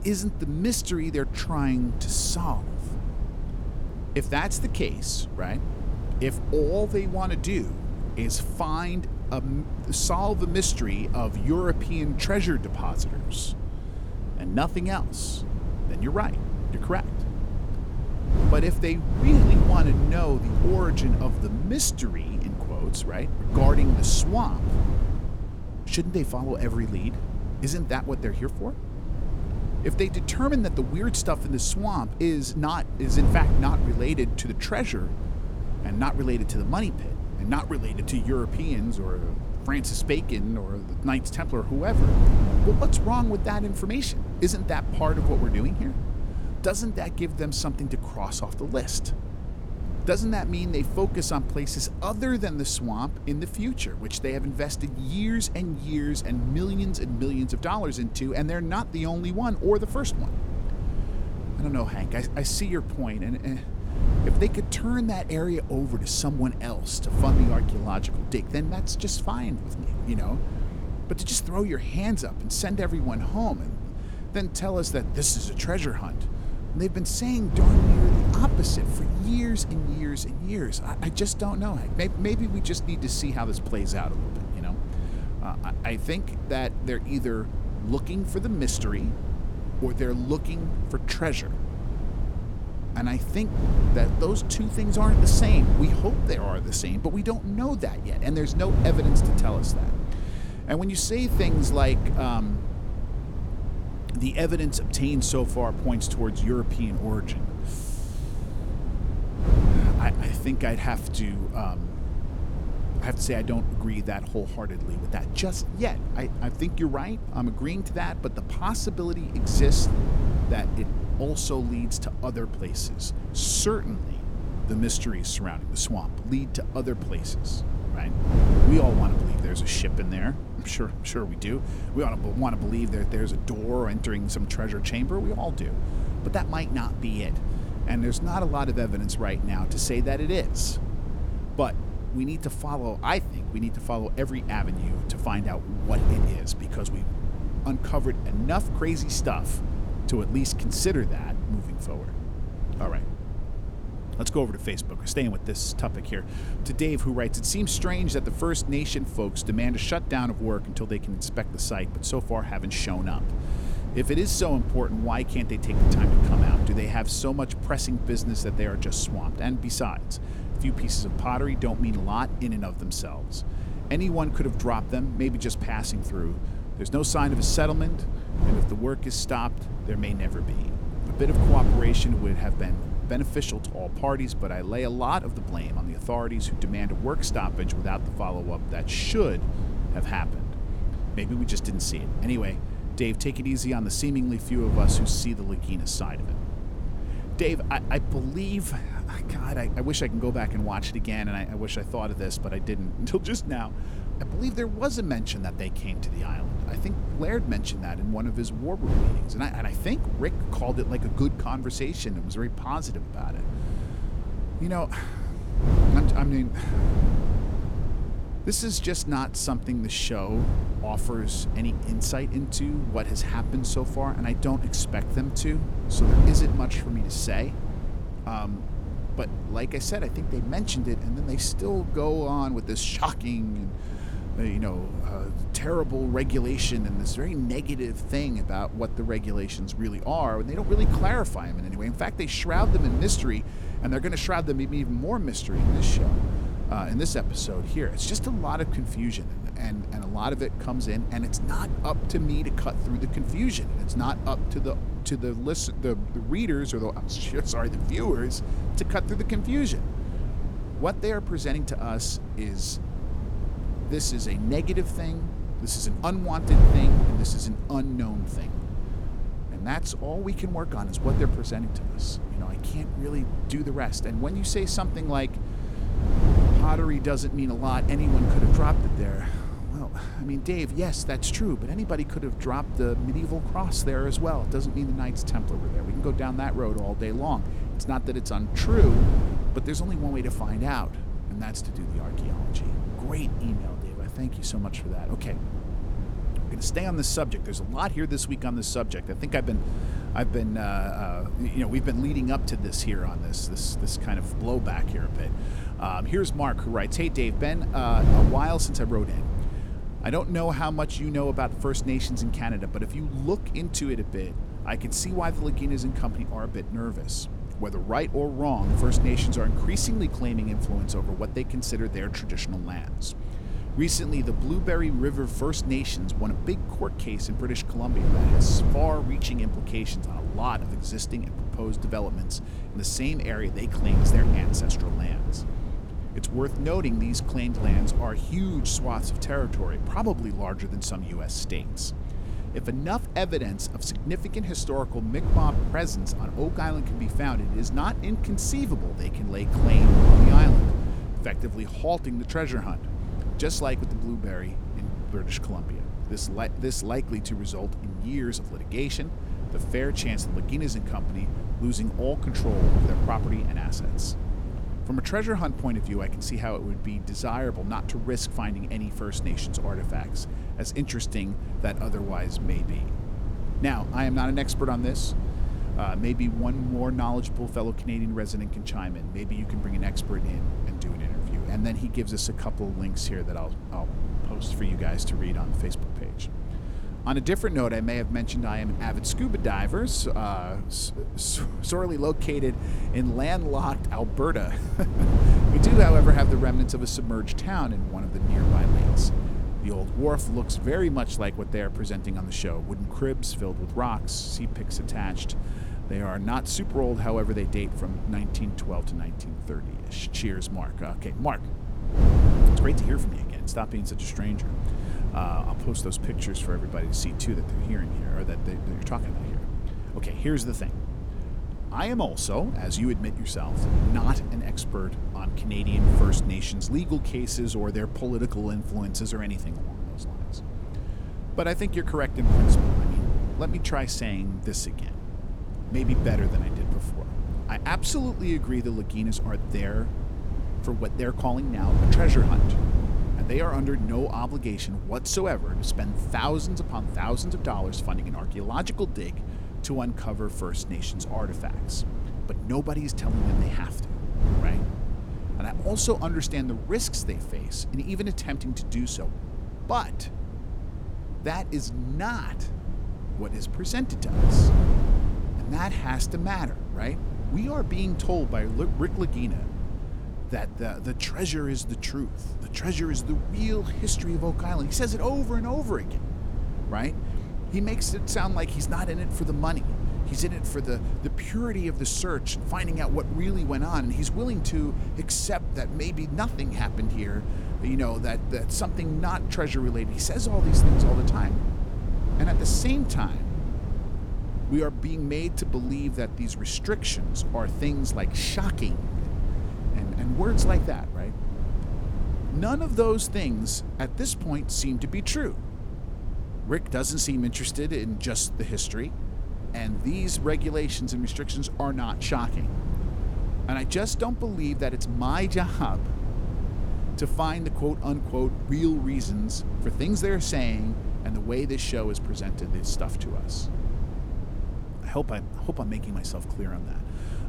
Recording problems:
wind noise on the microphone; heavy; 9 dB below the speech

